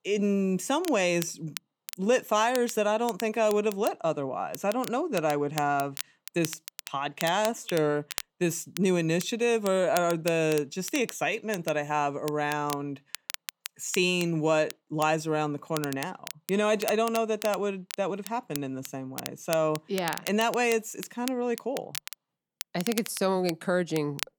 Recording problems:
crackle, like an old record; noticeable; 15 dB below the speech

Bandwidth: 18.5 kHz